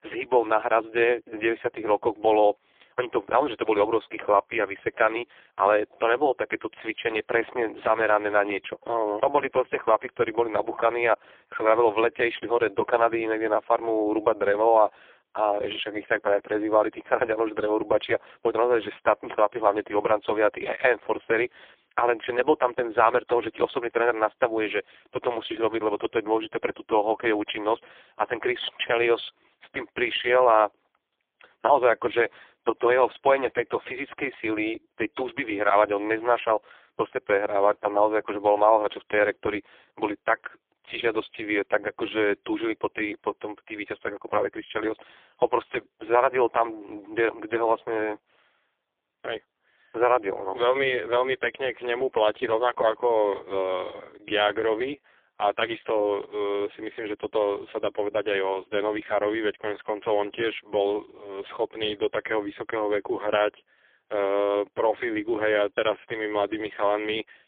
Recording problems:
phone-call audio; poor line; nothing above 3.5 kHz

